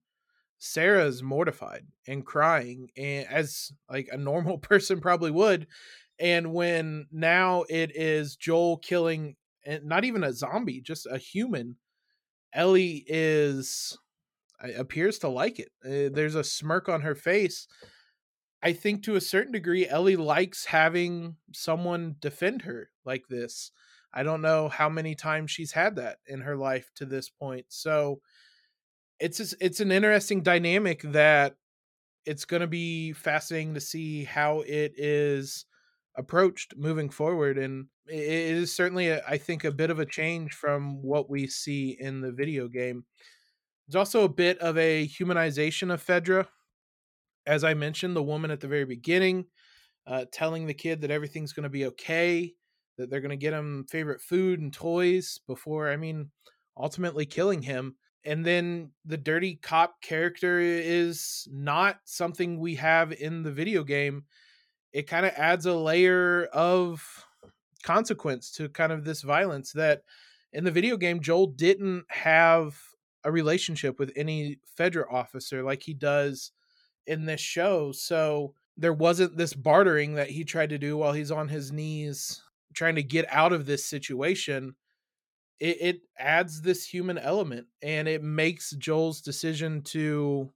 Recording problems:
none

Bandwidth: 17 kHz